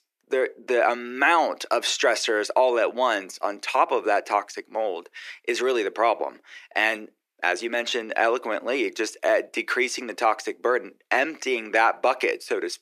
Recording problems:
thin; very; fading below 350 Hz

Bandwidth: 14.5 kHz